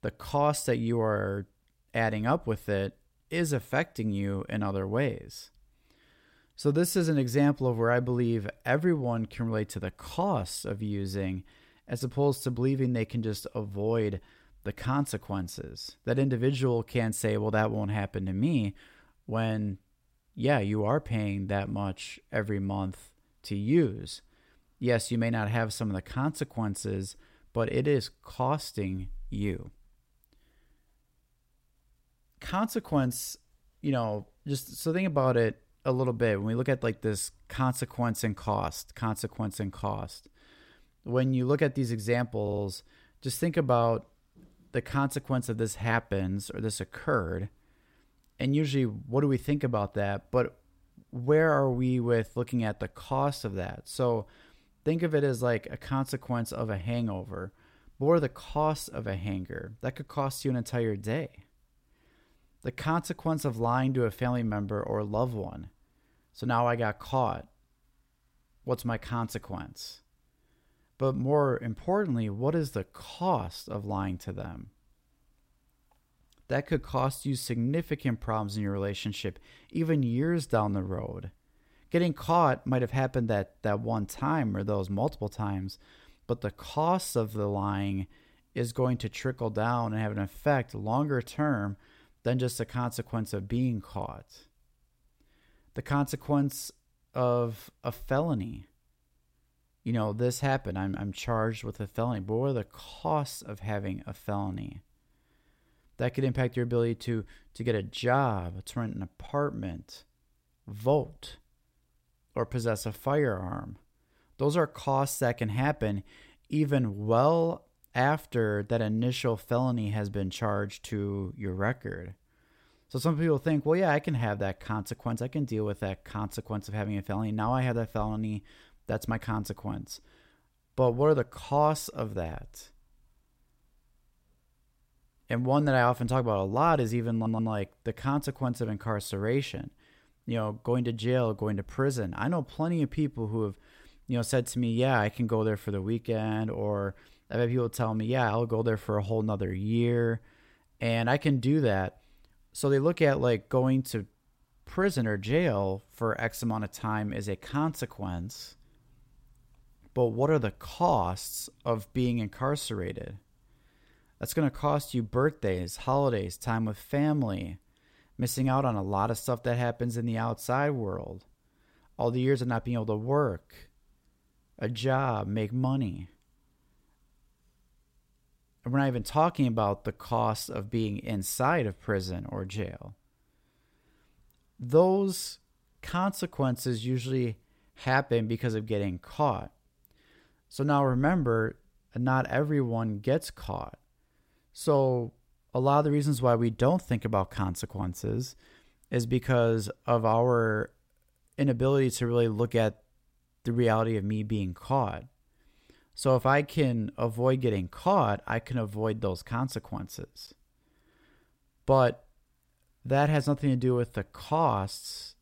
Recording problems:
audio stuttering; at 42 s and at 2:17

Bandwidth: 16 kHz